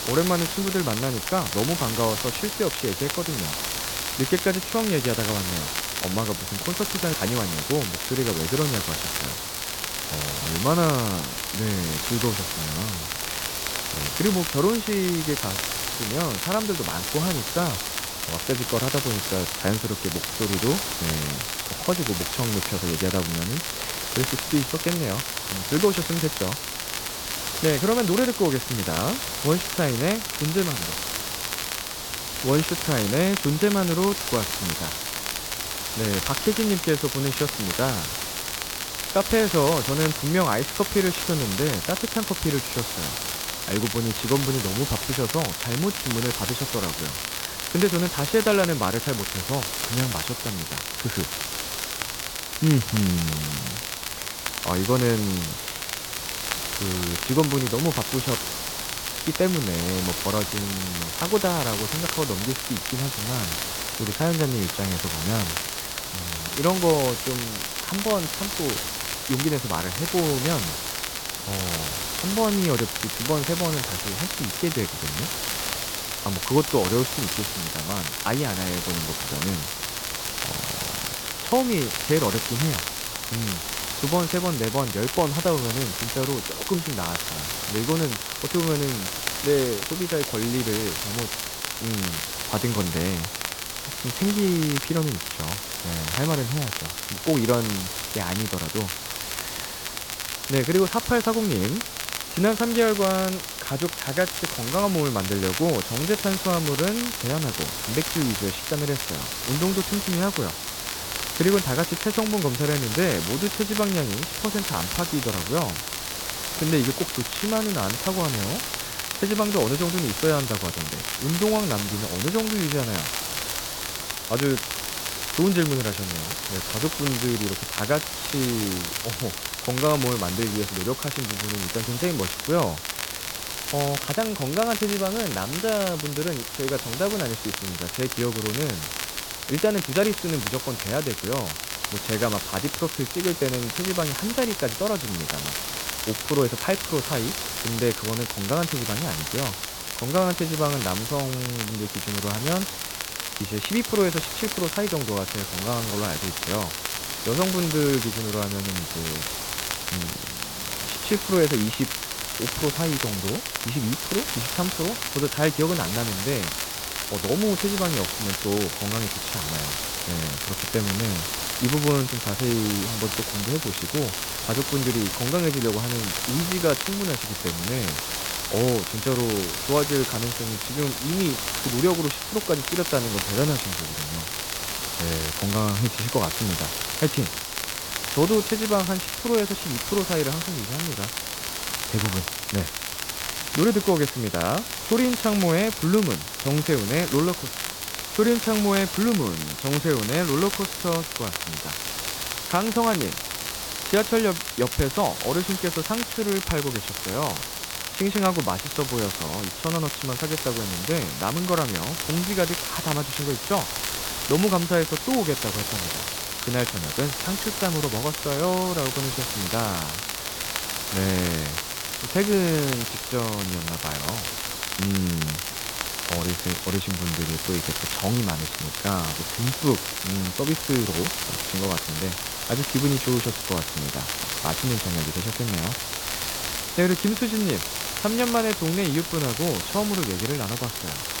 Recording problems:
high frequencies cut off; severe; nothing above 4 kHz
hiss; loud; throughout; 3 dB below the speech
crackle, like an old record; loud; 6 dB below the speech

